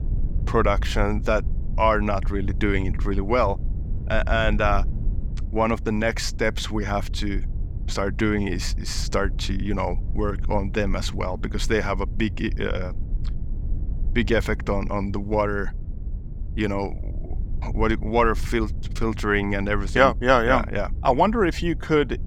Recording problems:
low rumble; faint; throughout; 20 dB below the speech

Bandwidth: 17.5 kHz